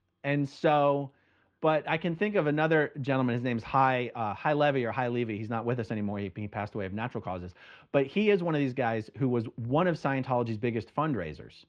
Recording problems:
muffled; slightly; fading above 3 kHz

